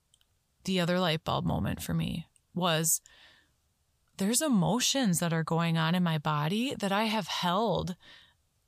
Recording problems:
none

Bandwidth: 15 kHz